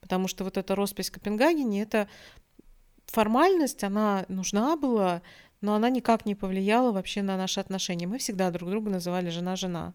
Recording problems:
none

